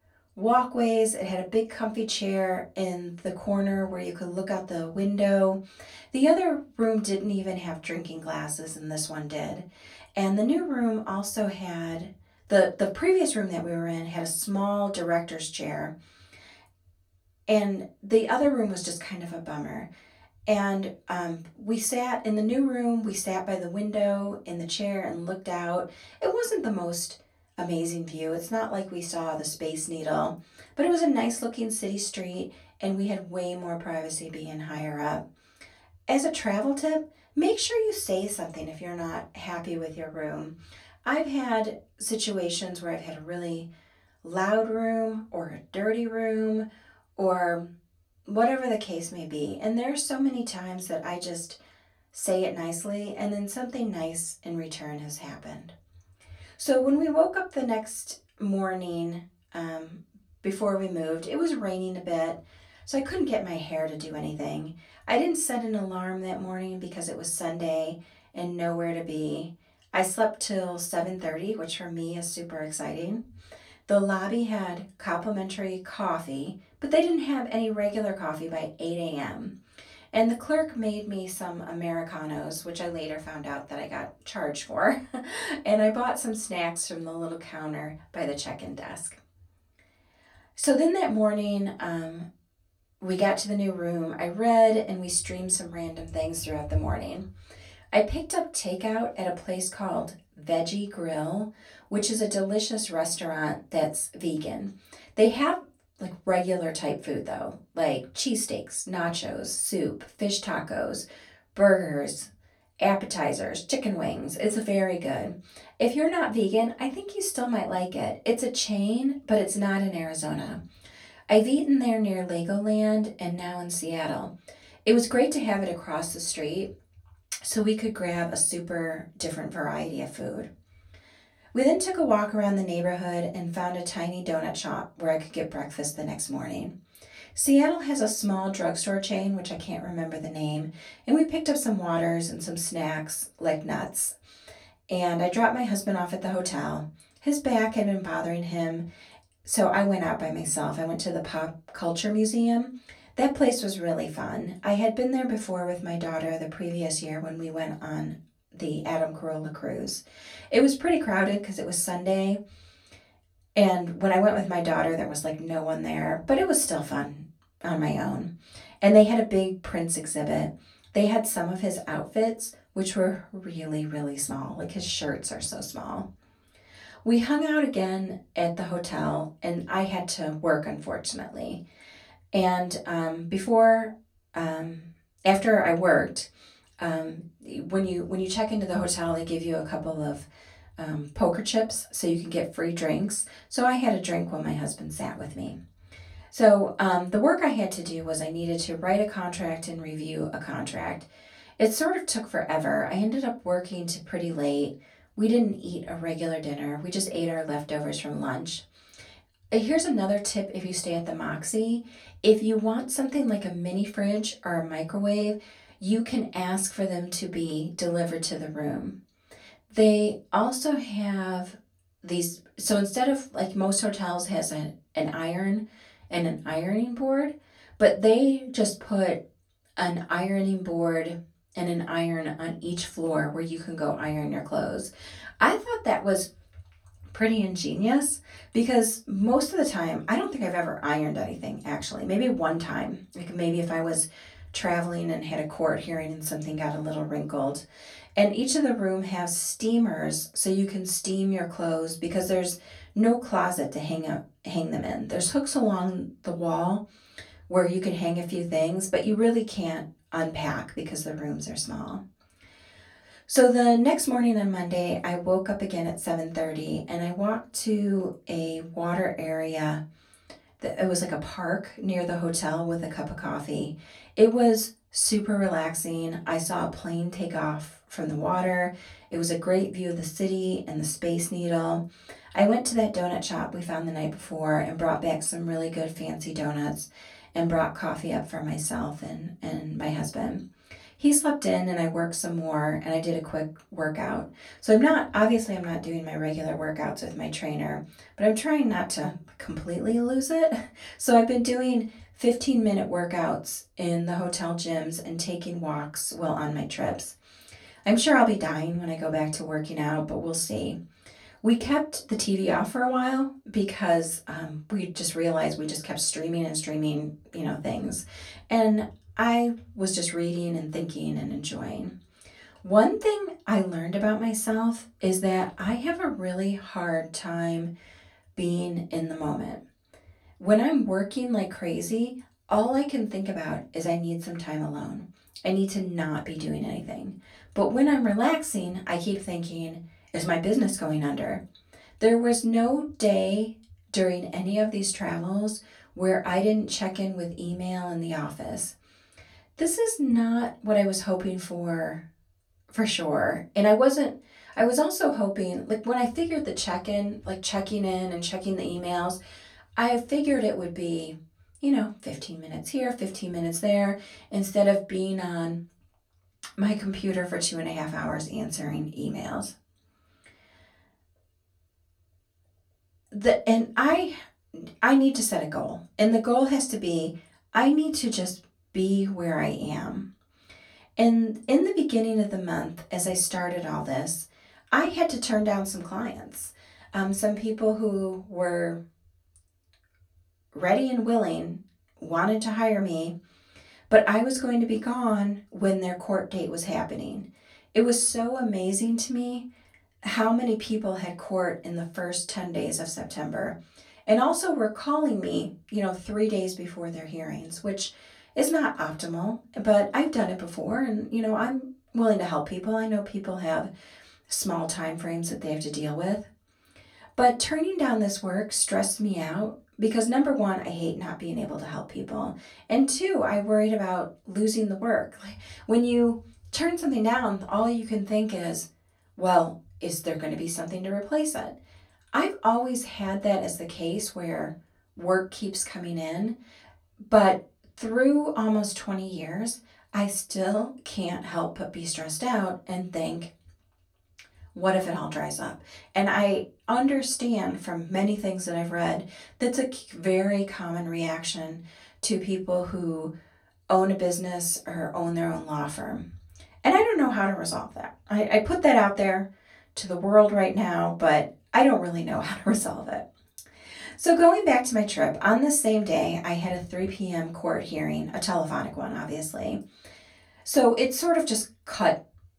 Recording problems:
off-mic speech; far
room echo; very slight; dies away in 0.2 s

